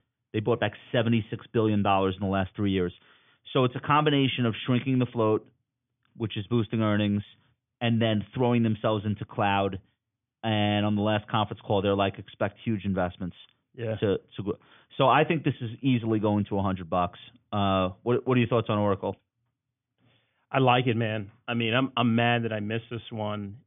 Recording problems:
high frequencies cut off; severe; nothing above 3.5 kHz

